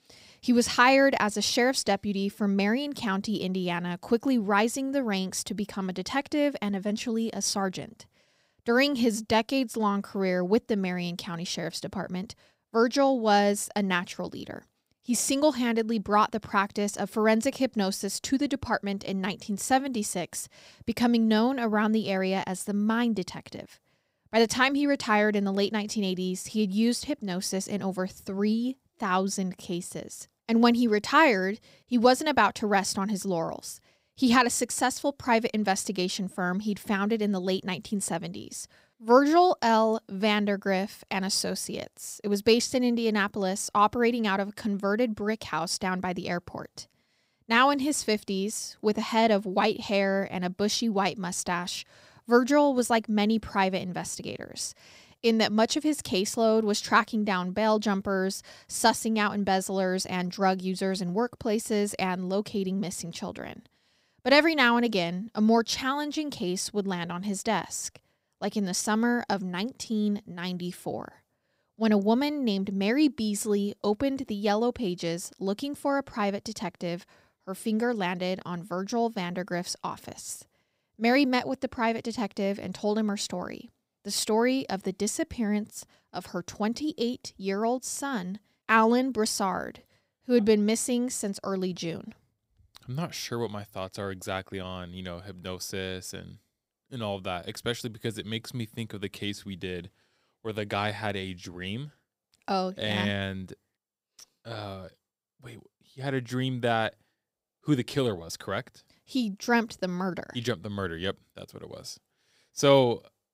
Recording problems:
none

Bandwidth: 15.5 kHz